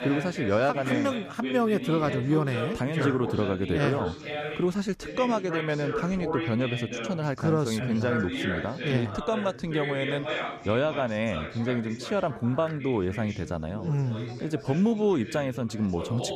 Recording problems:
background chatter; loud; throughout; 3 voices, 7 dB below the speech

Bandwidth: 14.5 kHz